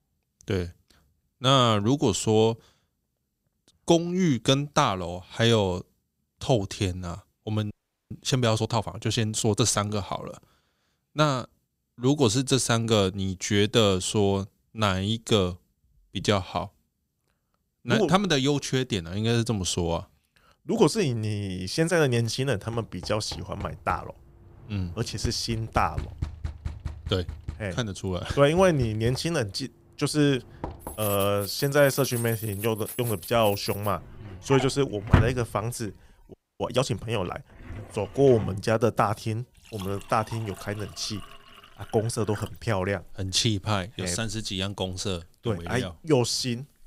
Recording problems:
household noises; loud; from 23 s on; 10 dB below the speech
audio freezing; at 7.5 s and at 36 s

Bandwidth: 15.5 kHz